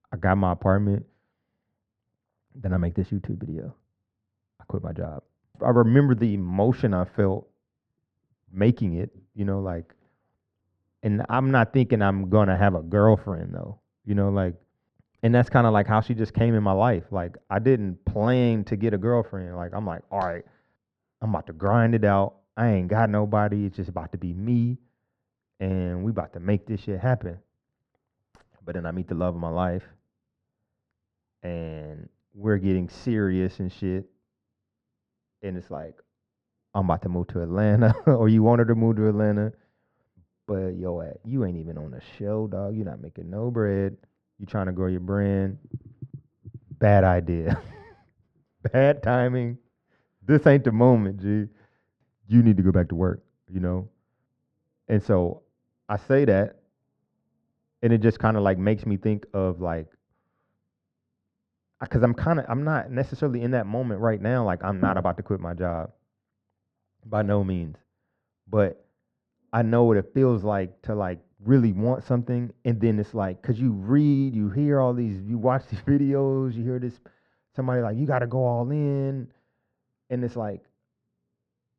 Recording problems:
muffled; very; fading above 1.5 kHz

